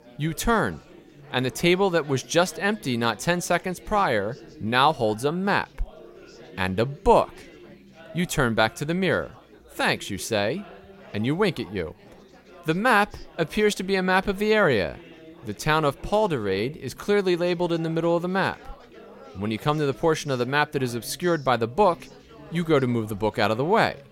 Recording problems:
chatter from many people; faint; throughout; 25 dB below the speech

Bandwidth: 16 kHz